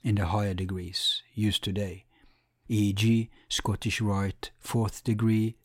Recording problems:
none

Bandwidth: 16 kHz